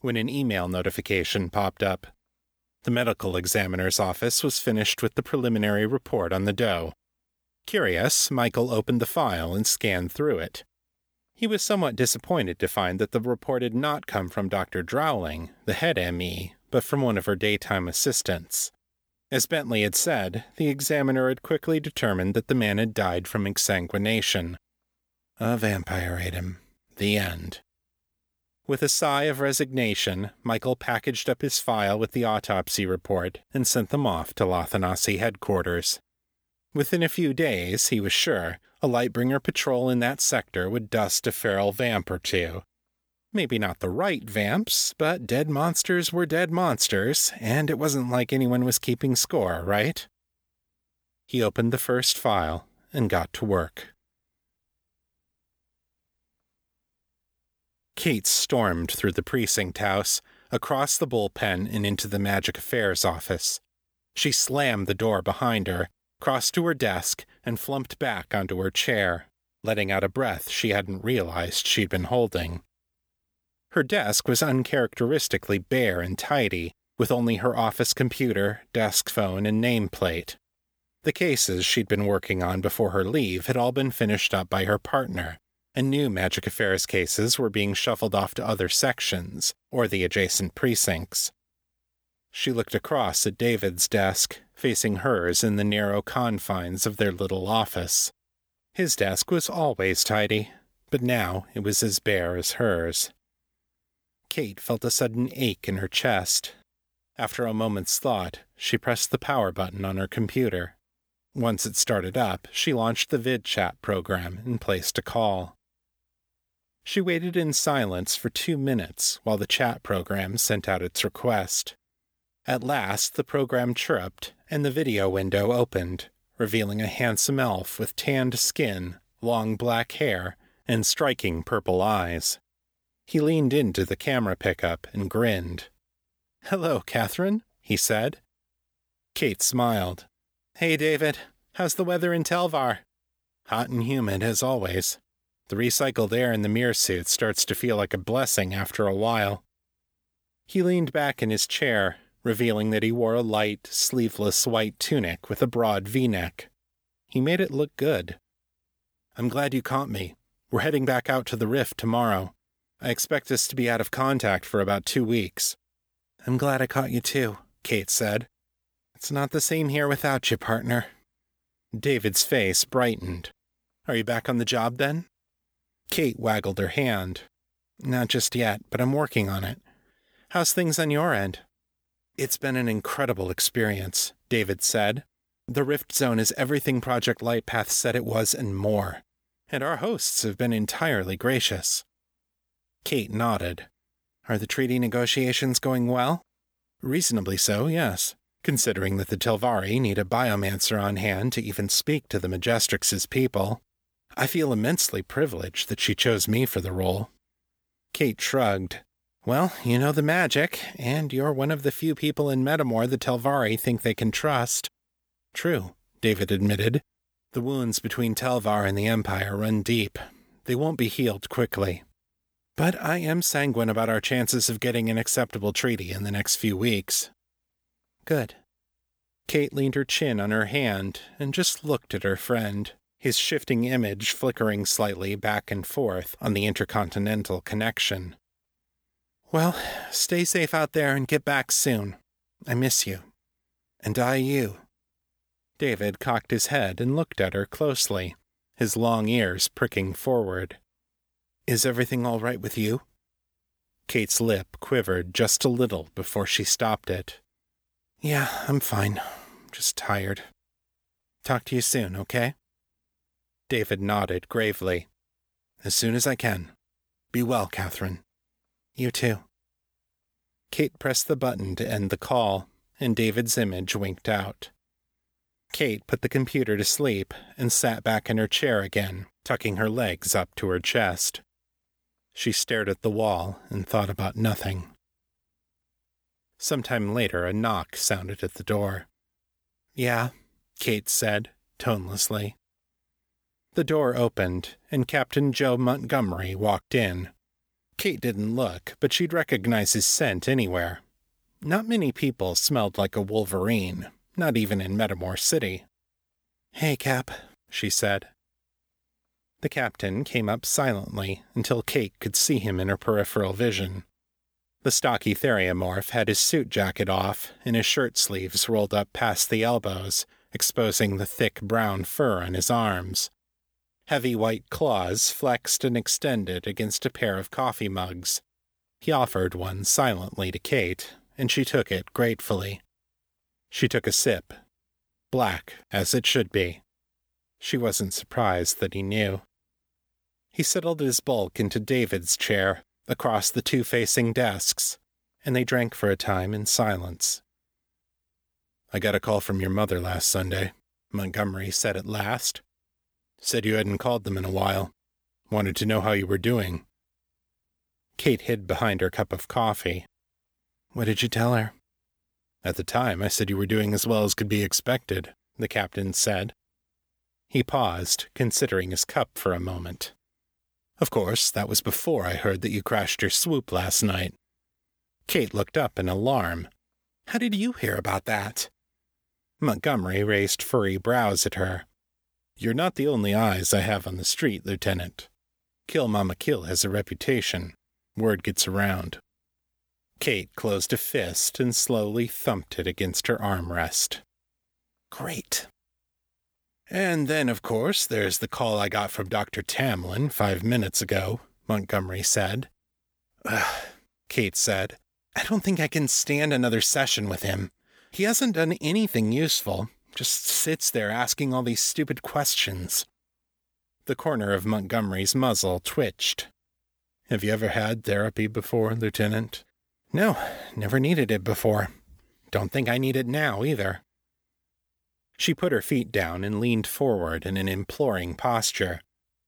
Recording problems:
none

